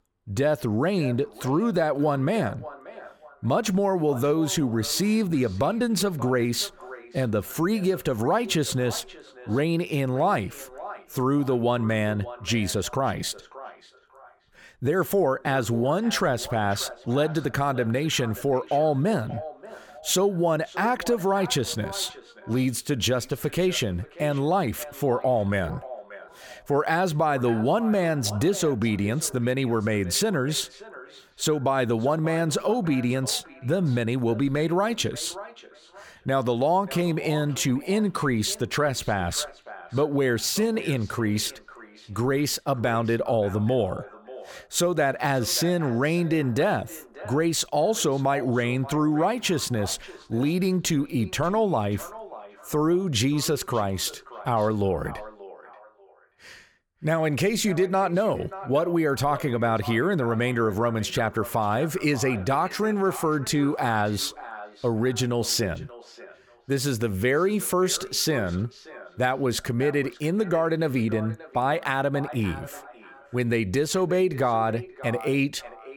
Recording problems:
echo of what is said; noticeable; throughout; 580 ms later, 20 dB below the speech

